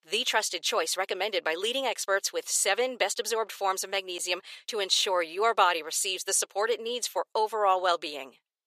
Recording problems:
thin; very; fading below 500 Hz

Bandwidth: 14.5 kHz